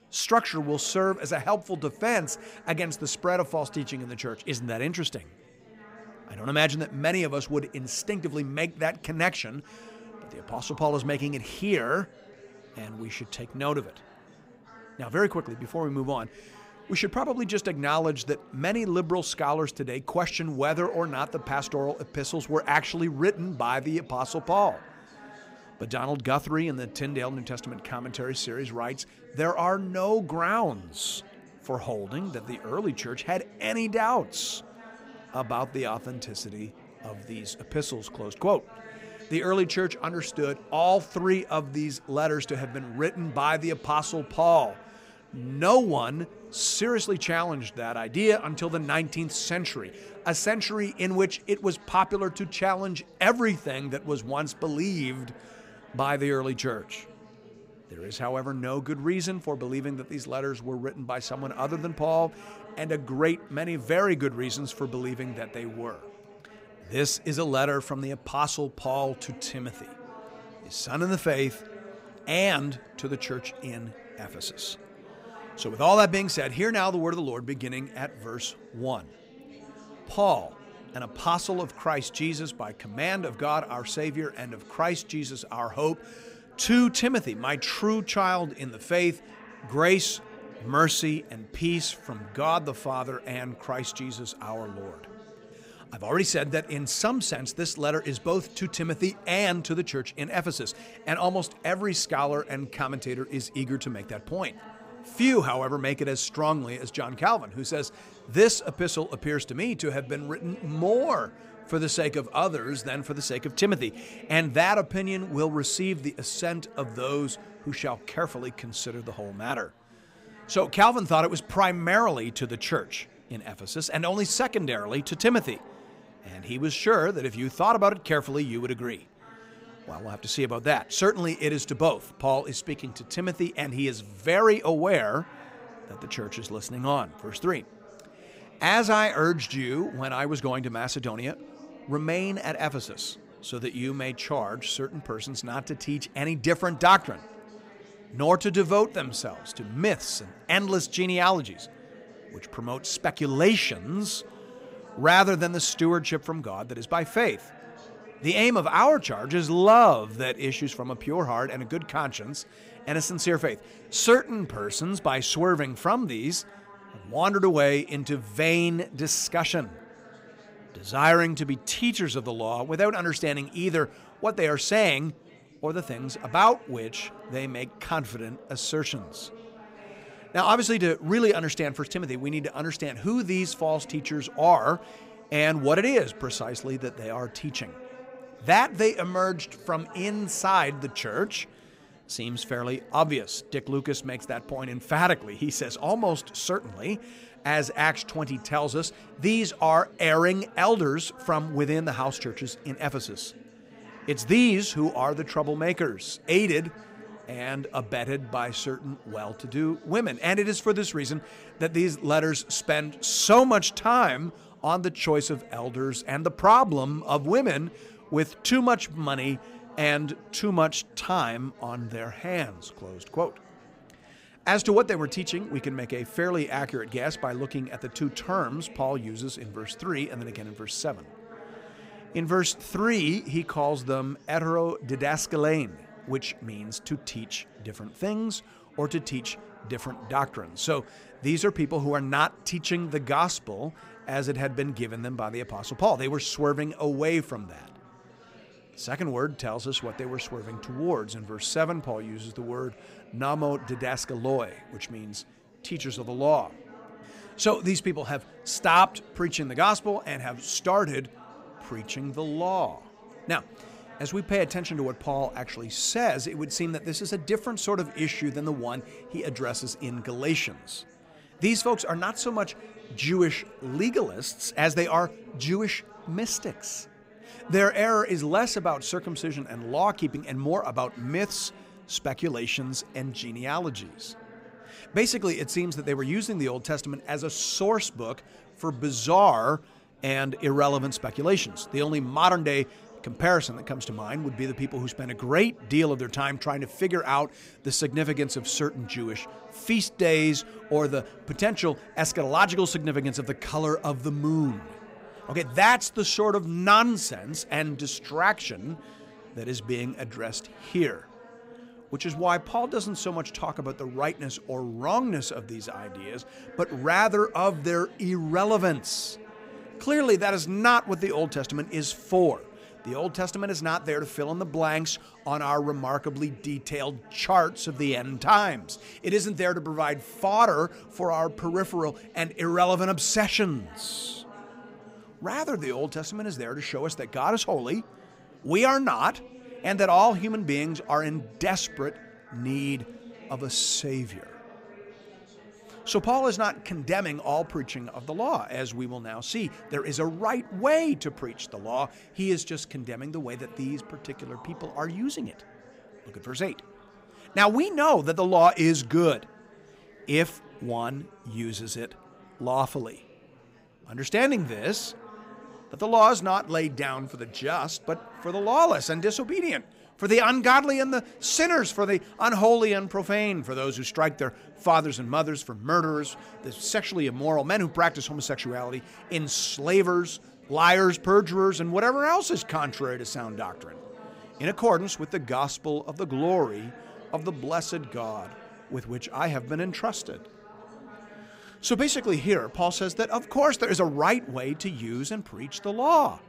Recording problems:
chatter from many people; faint; throughout; 20 dB below the speech

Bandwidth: 15.5 kHz